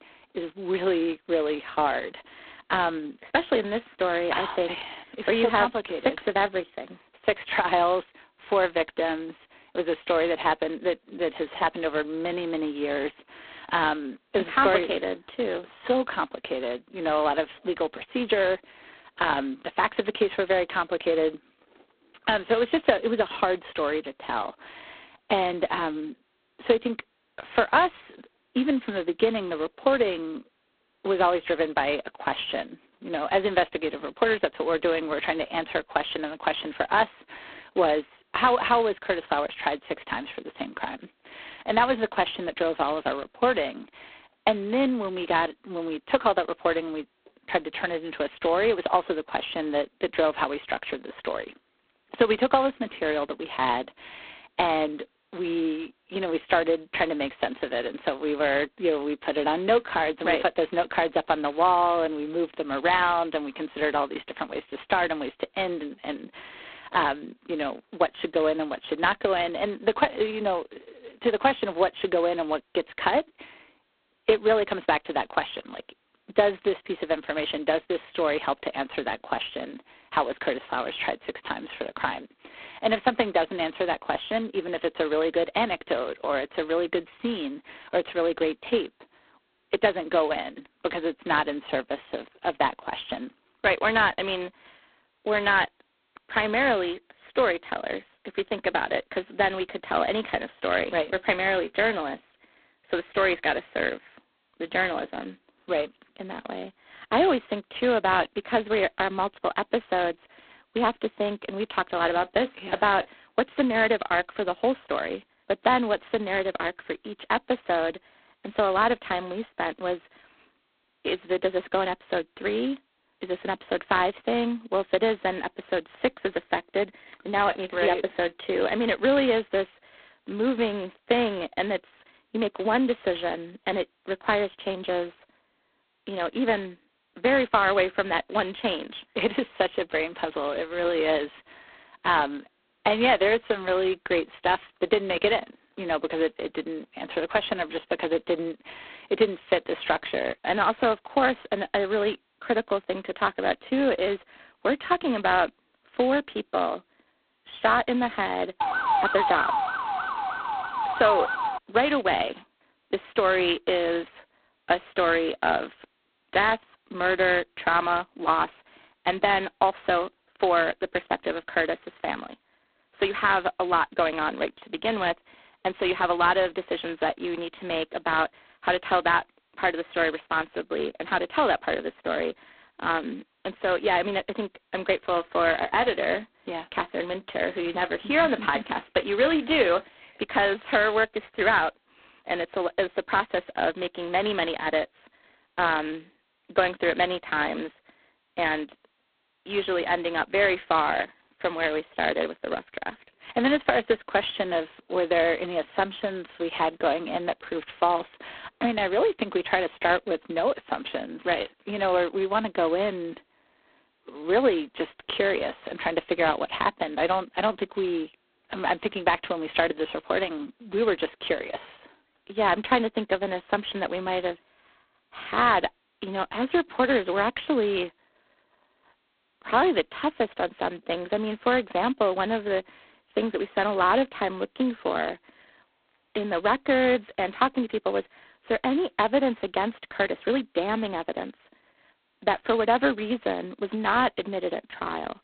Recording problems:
phone-call audio; poor line; nothing above 4 kHz
siren; loud; from 2:39 to 2:42; peak 3 dB above the speech

